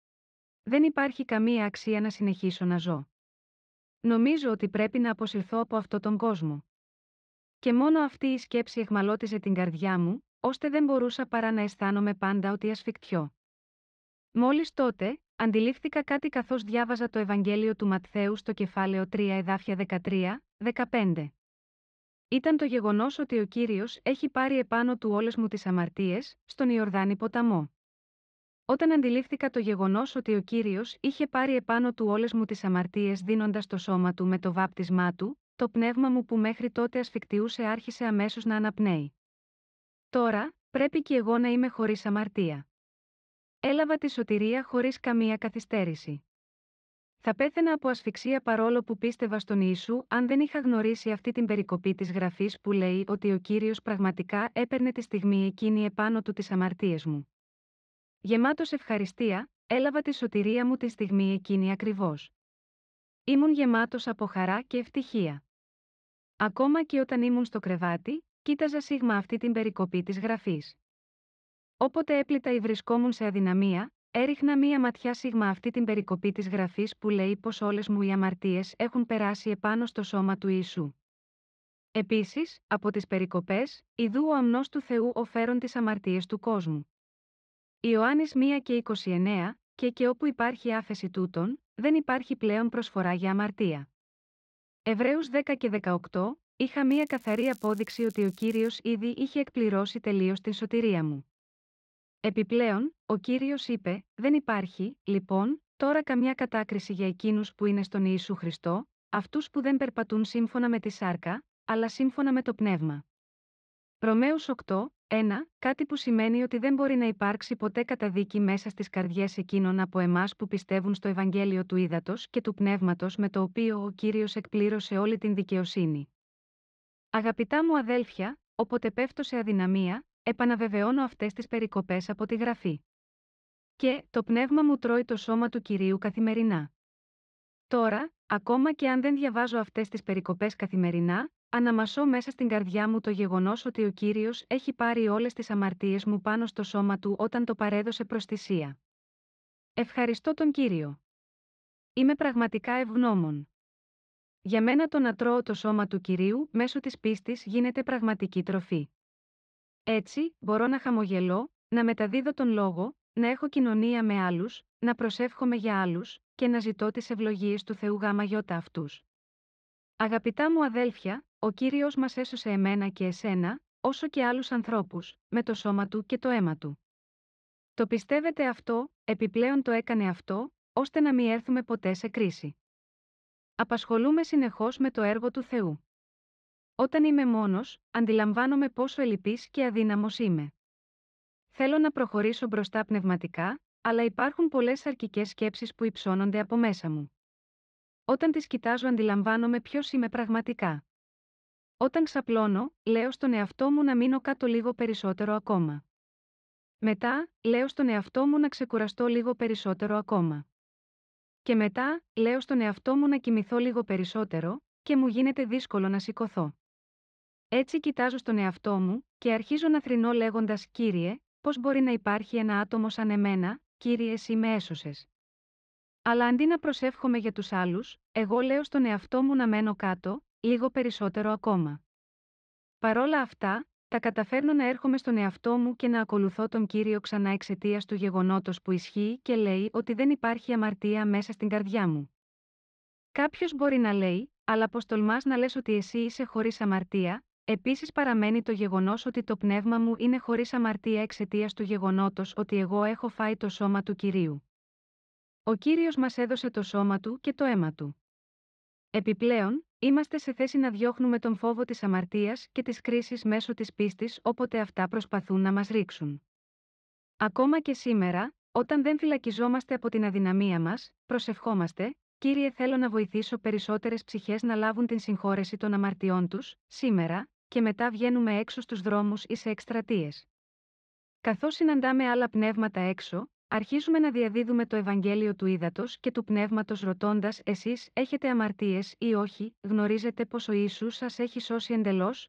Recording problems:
muffled; slightly; fading above 4 kHz
crackling; faint; from 1:37 to 1:39; 25 dB below the speech

